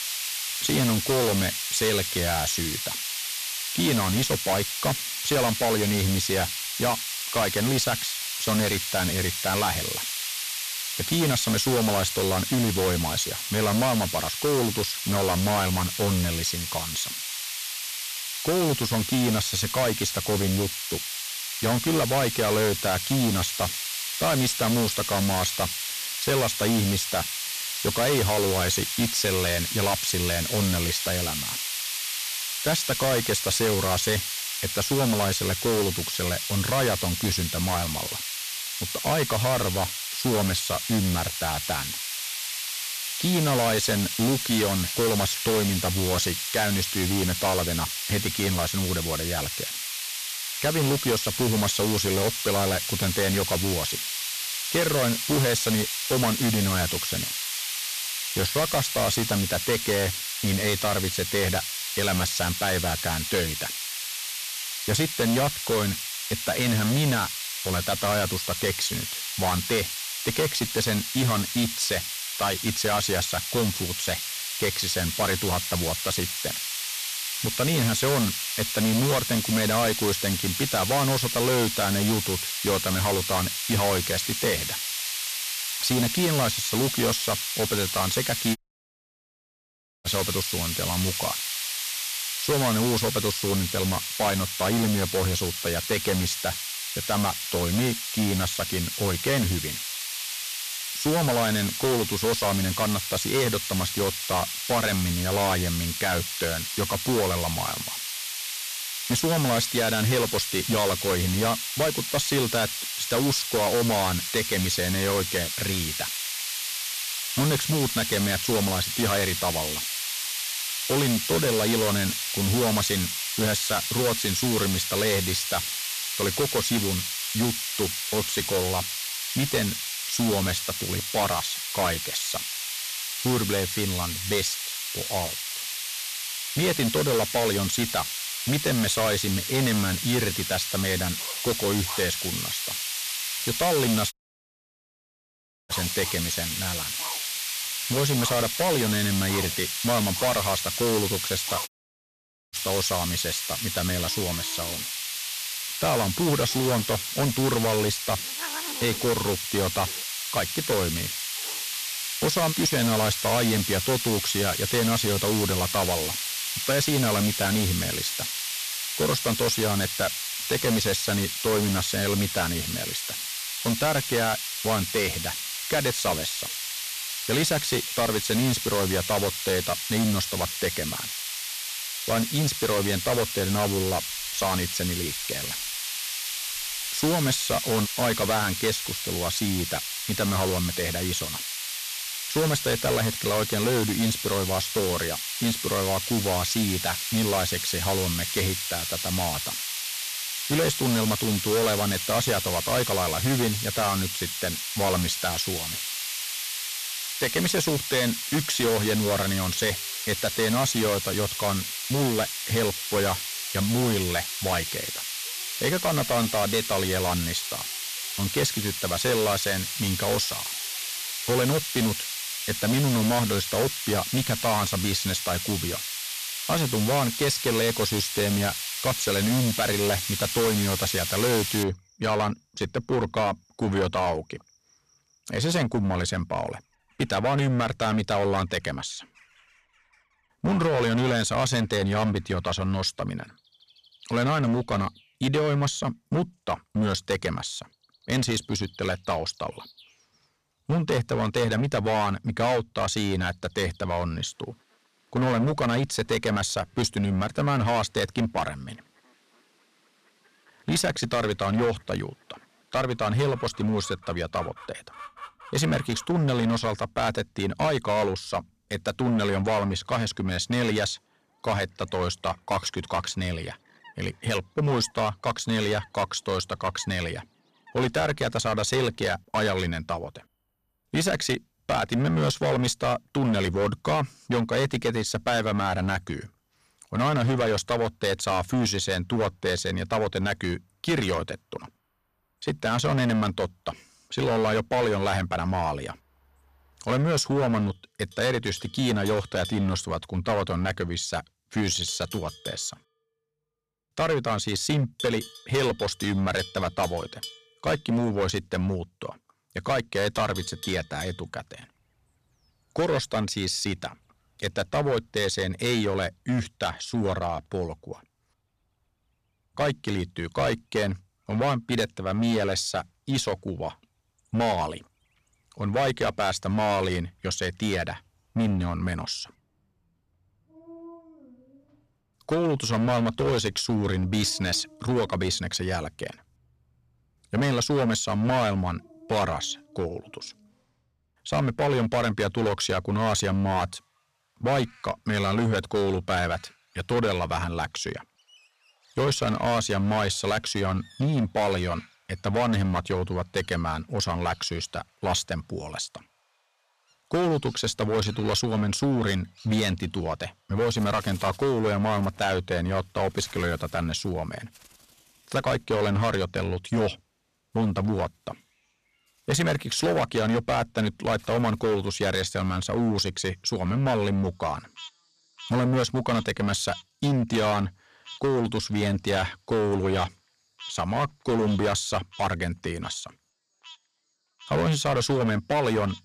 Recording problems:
distortion; heavy; 11% of the sound clipped
hiss; loud; until 3:52; 2 dB below the speech
animal sounds; faint; from 2:21 on; 20 dB below the speech
audio cutting out; at 1:29 for 1.5 s, at 2:24 for 1.5 s and at 2:32 for 1 s

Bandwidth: 14.5 kHz